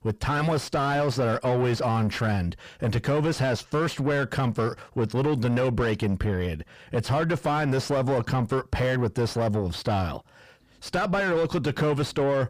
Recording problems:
distortion; heavy; 7 dB below the speech

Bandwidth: 15 kHz